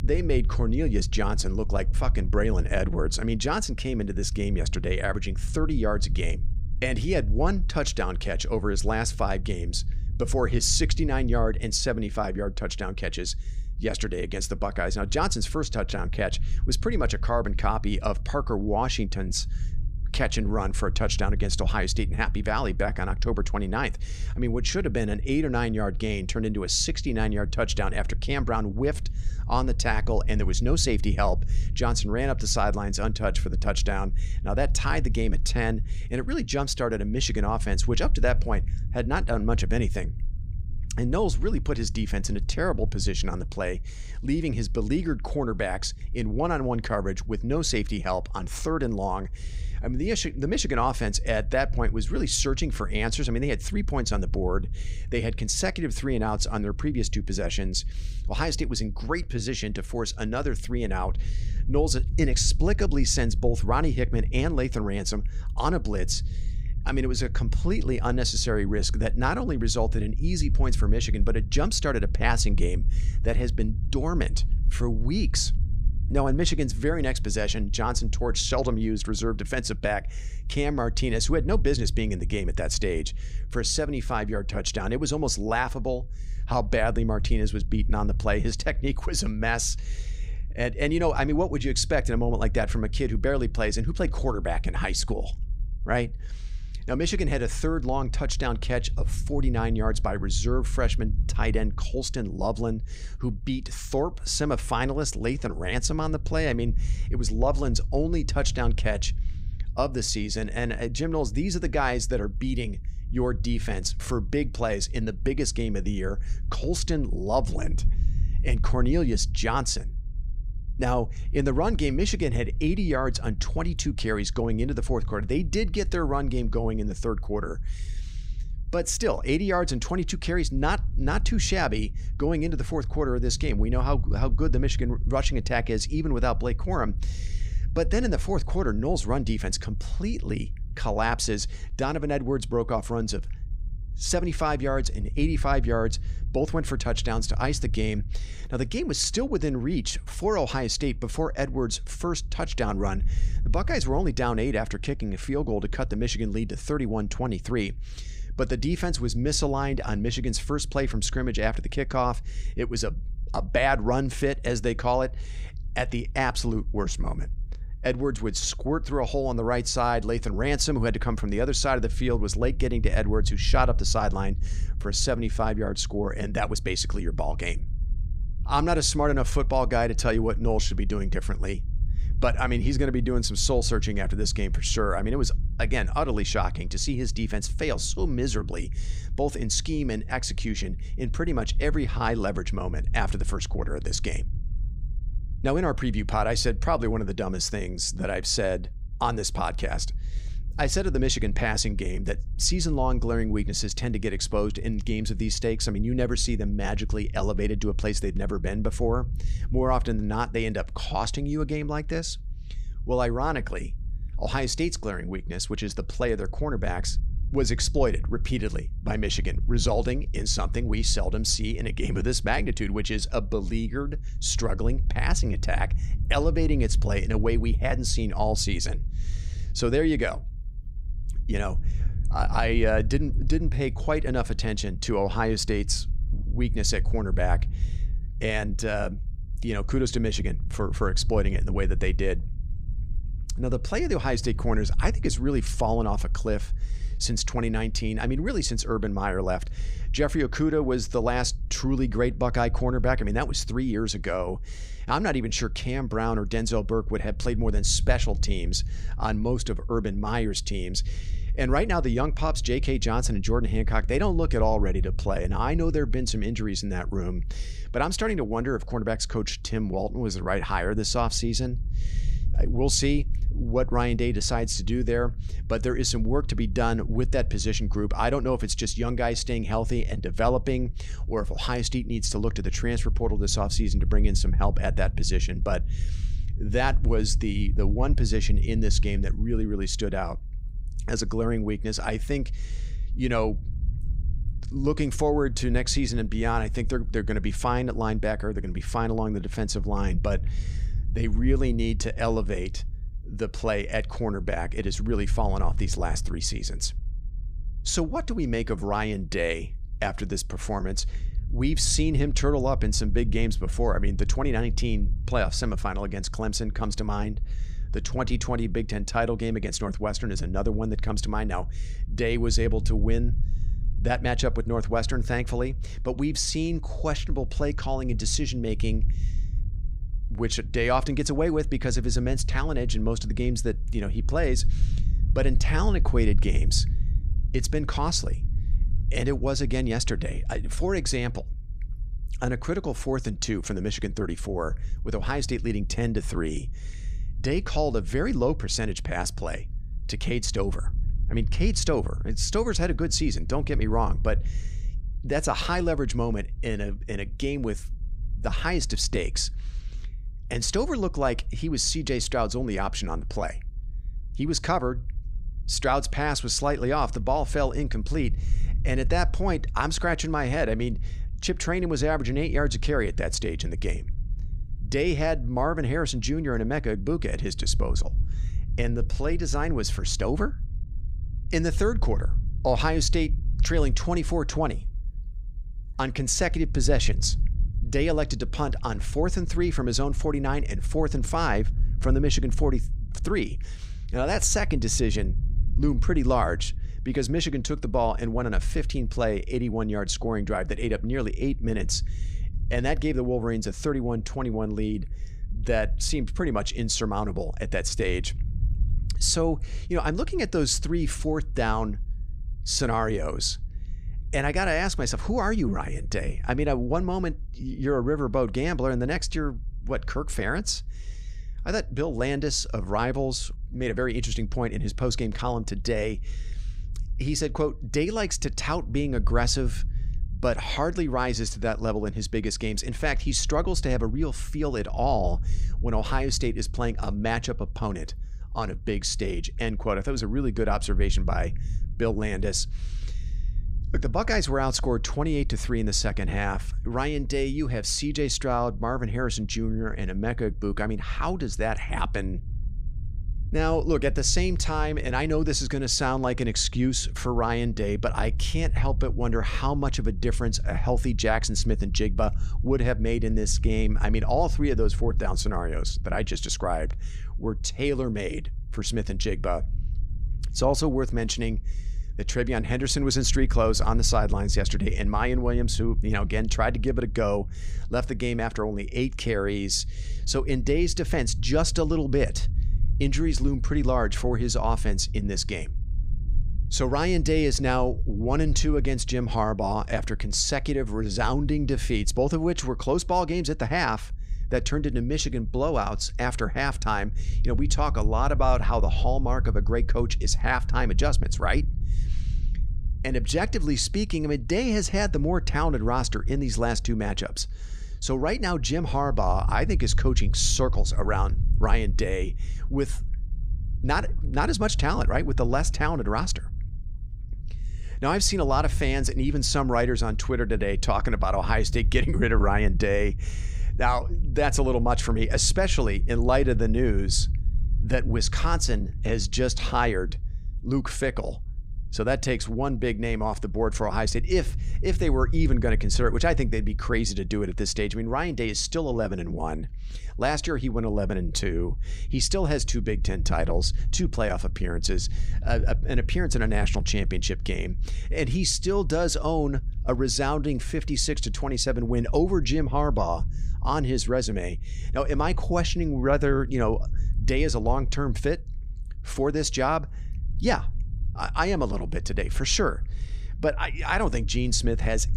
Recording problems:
low rumble; faint; throughout; 25 dB below the speech

